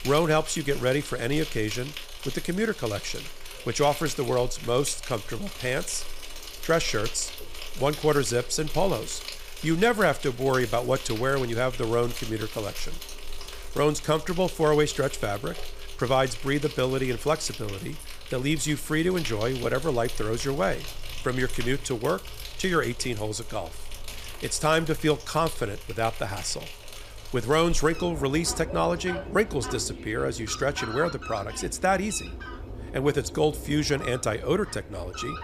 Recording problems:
animal sounds; noticeable; throughout; 10 dB below the speech

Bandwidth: 15 kHz